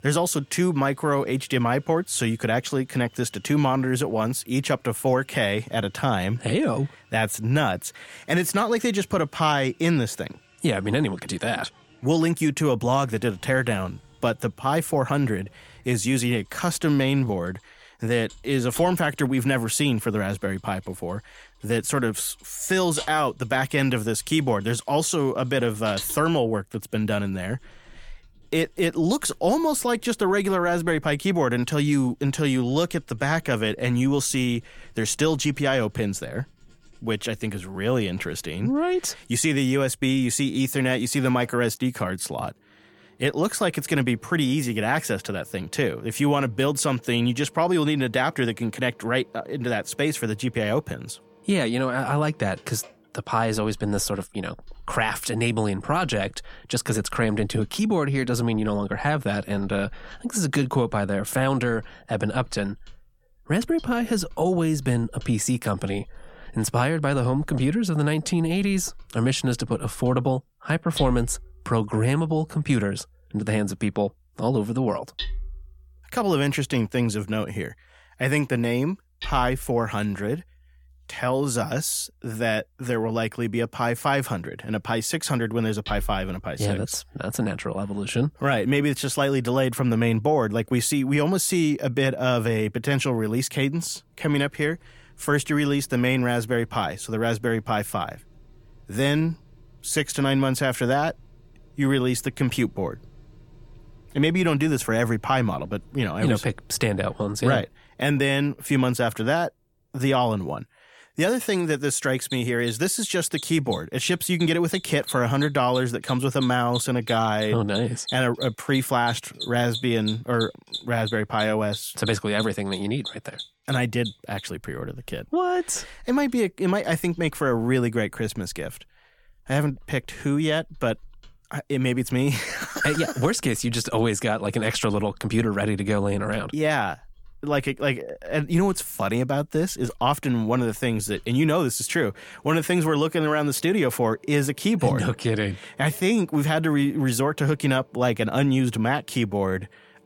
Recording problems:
machinery noise; noticeable; throughout; 15 dB below the speech

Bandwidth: 17.5 kHz